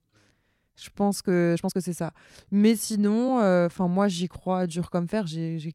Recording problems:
uneven, jittery; strongly; from 0.5 to 5 s

